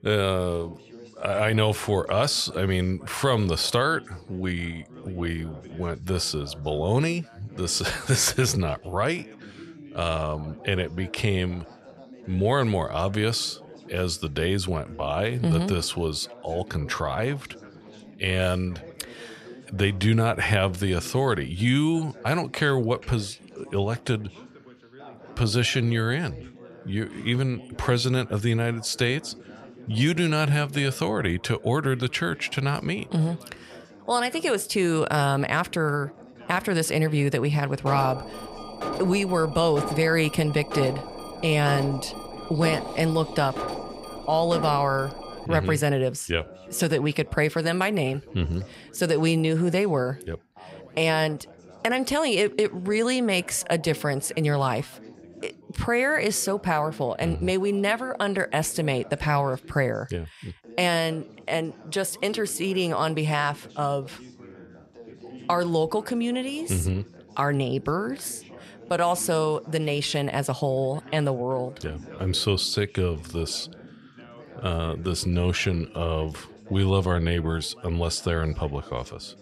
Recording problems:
background chatter; faint; throughout; 3 voices, 20 dB below the speech
alarm; noticeable; from 38 to 45 s; peak 6 dB below the speech

